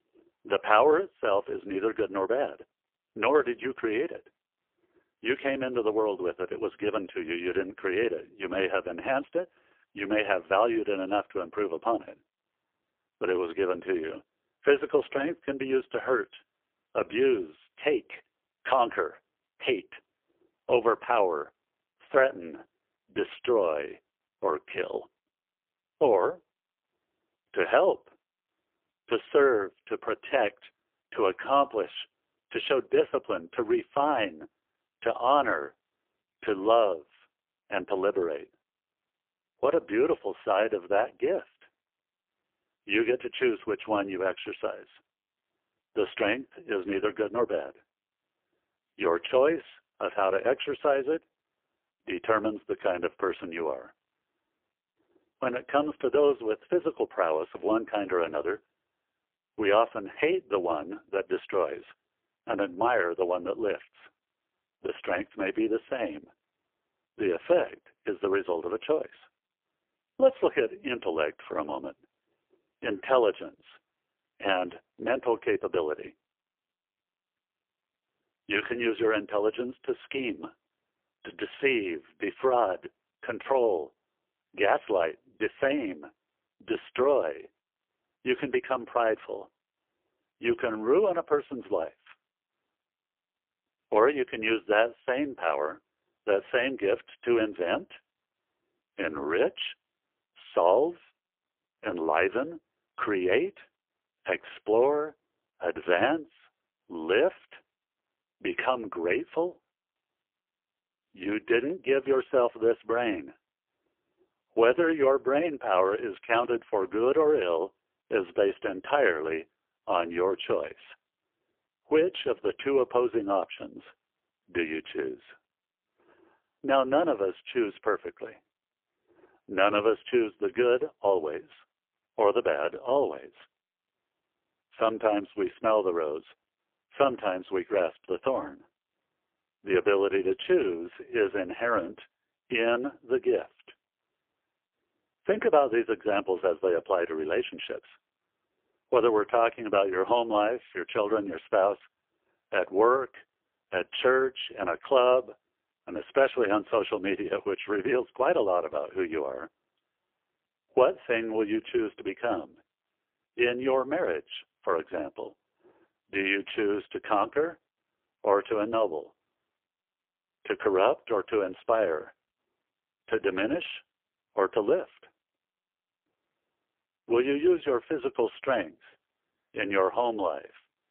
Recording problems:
phone-call audio; poor line; nothing above 3 kHz

